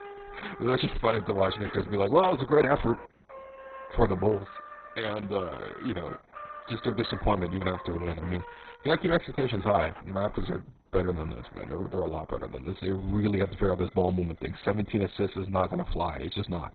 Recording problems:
garbled, watery; badly; nothing above 4 kHz
background music; noticeable; throughout; 15 dB below the speech

